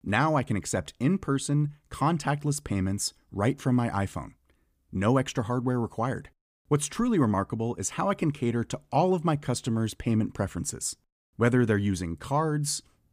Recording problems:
none

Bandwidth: 15 kHz